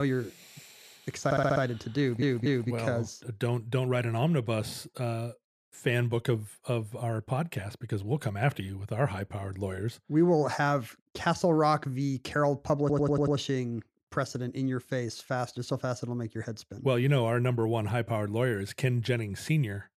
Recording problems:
abrupt cut into speech; at the start
audio stuttering; at 1.5 s, at 2 s and at 13 s

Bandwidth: 14.5 kHz